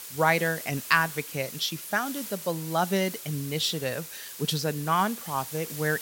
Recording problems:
hiss; loud; throughout; 10 dB below the speech

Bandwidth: 16.5 kHz